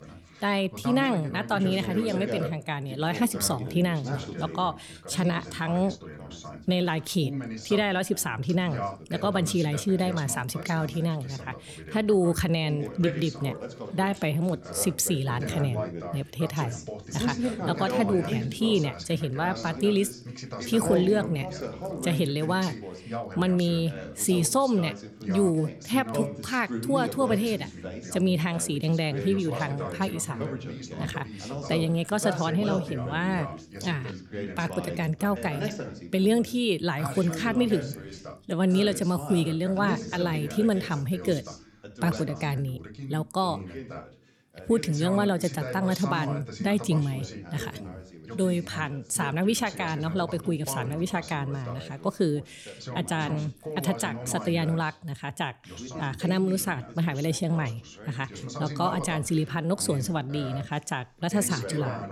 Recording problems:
background chatter; loud; throughout; 2 voices, 9 dB below the speech

